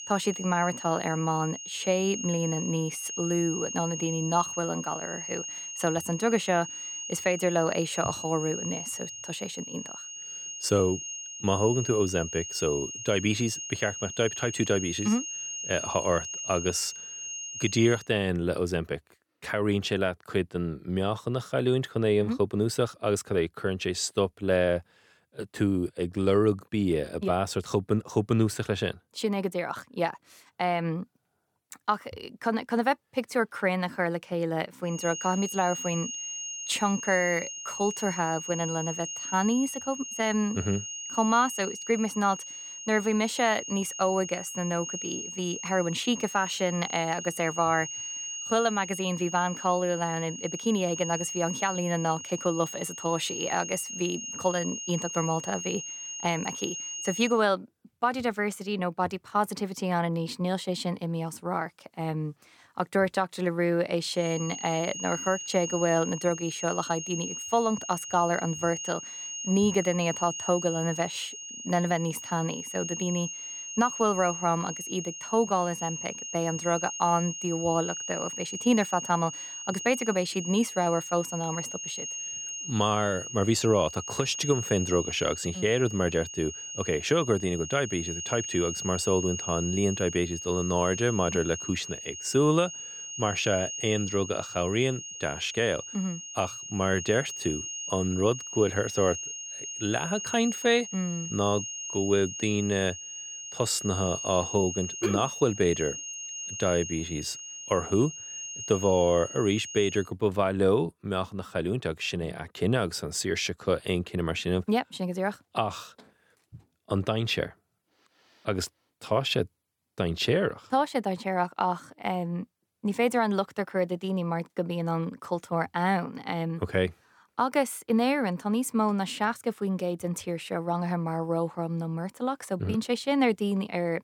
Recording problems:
high-pitched whine; loud; until 18 s, from 35 to 57 s and from 1:04 to 1:50; 6.5 kHz, 7 dB below the speech

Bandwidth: 18.5 kHz